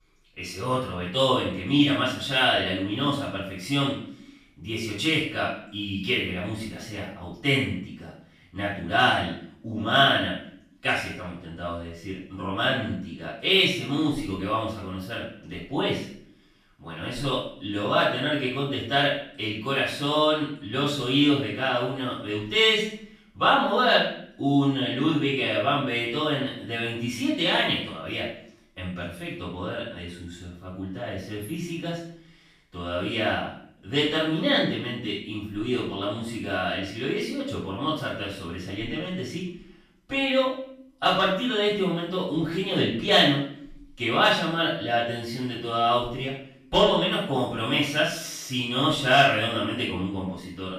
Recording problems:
off-mic speech; far
room echo; noticeable; dies away in 0.5 s

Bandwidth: 14.5 kHz